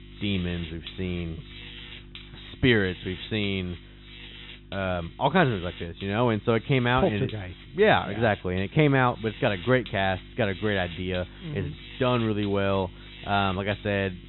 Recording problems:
high frequencies cut off; severe; nothing above 4 kHz
electrical hum; noticeable; throughout; 50 Hz, 15 dB below the speech

